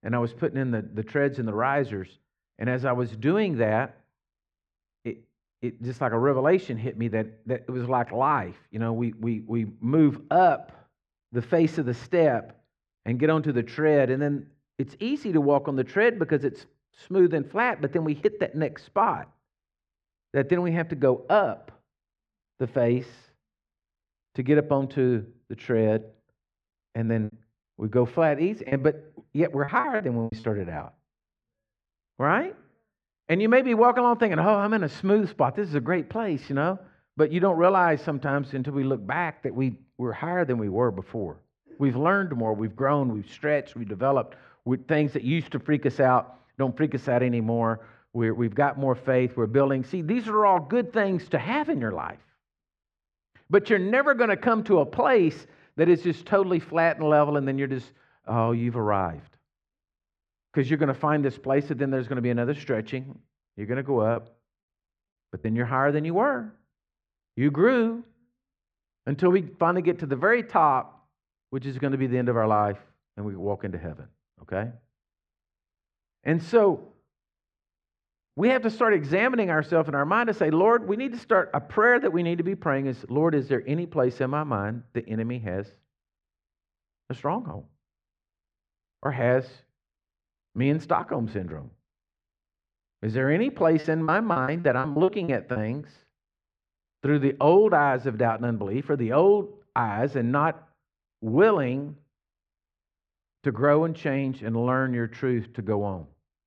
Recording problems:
muffled; slightly; fading above 2.5 kHz
choppy; very; from 27 to 30 s, from 1:04 to 1:05 and from 1:34 to 1:36; 14% of the speech affected

